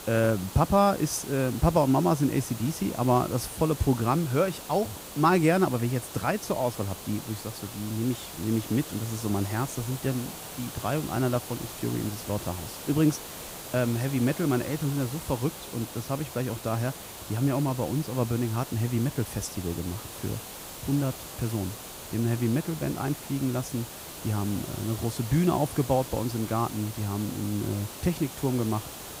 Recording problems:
hiss; noticeable; throughout; 10 dB below the speech

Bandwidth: 15.5 kHz